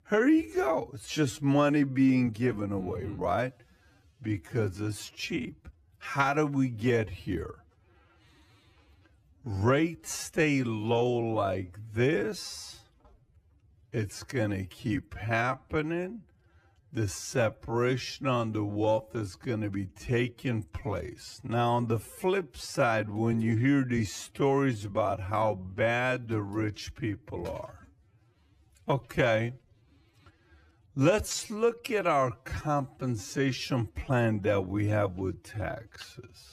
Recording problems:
wrong speed, natural pitch; too slow; 0.5 times normal speed

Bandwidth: 14.5 kHz